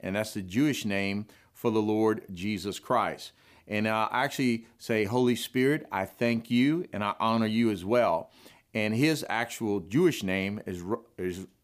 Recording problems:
none

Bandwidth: 15 kHz